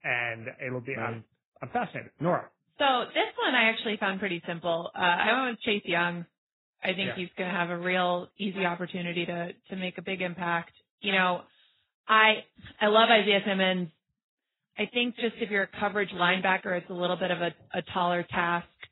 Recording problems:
garbled, watery; badly; nothing above 4 kHz

